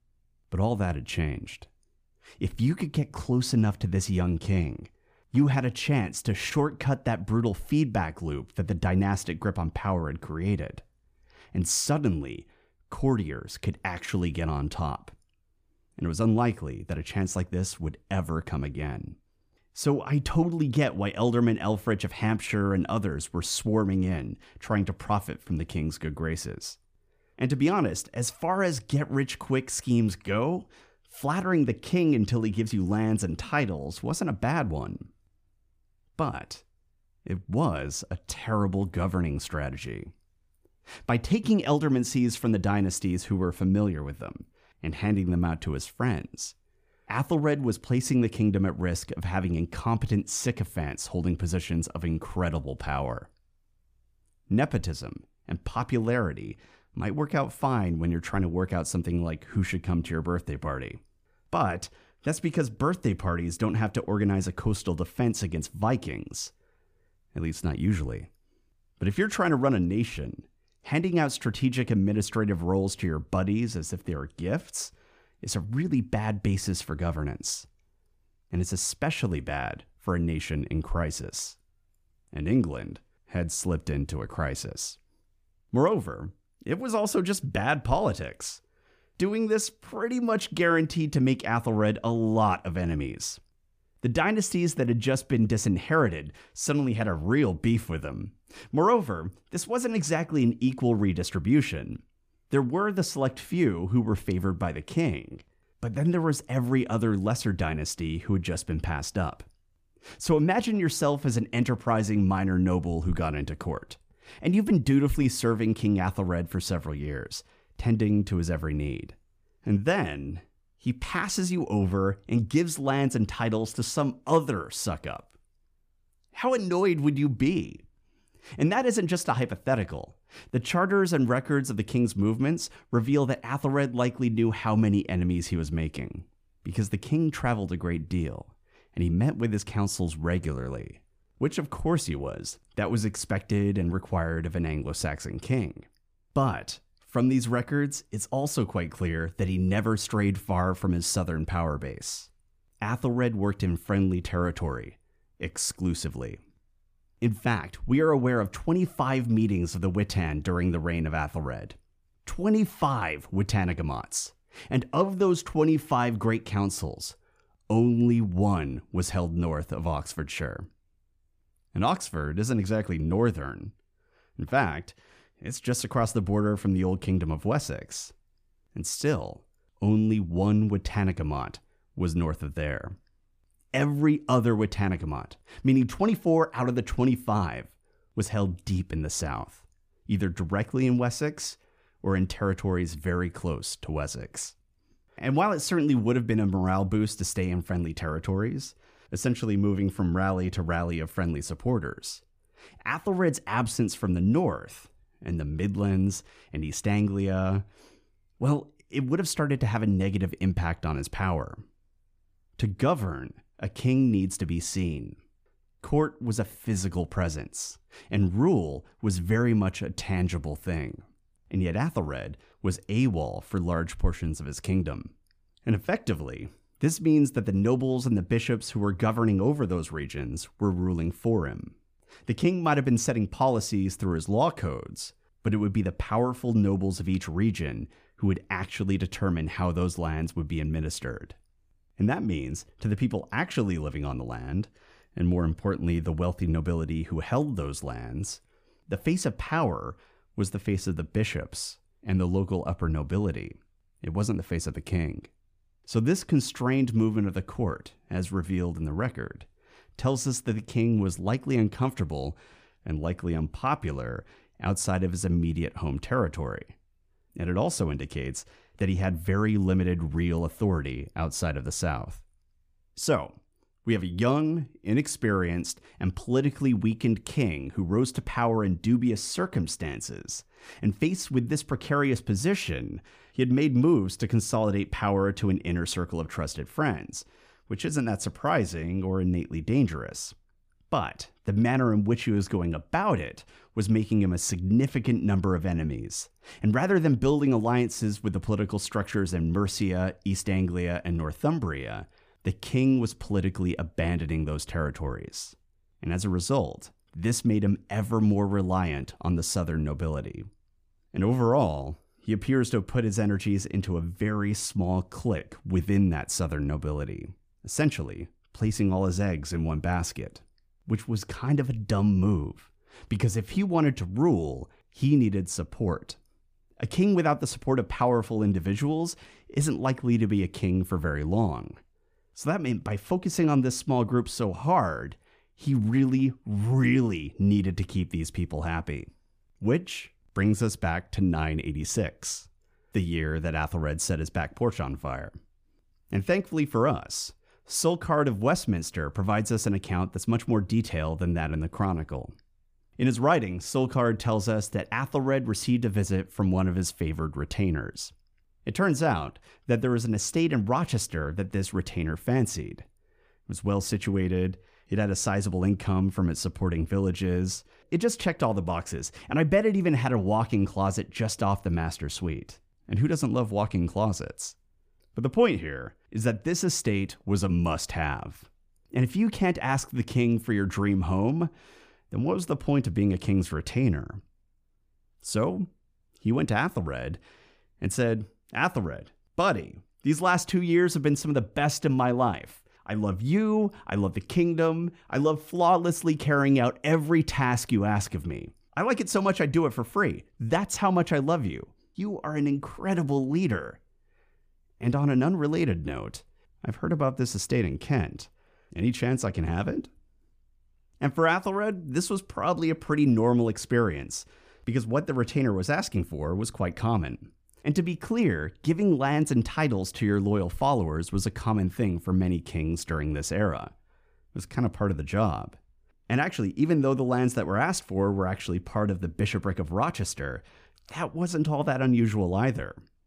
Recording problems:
none

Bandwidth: 15 kHz